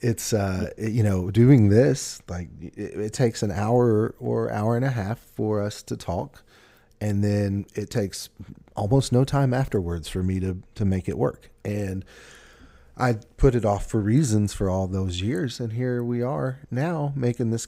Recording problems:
none

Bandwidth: 15.5 kHz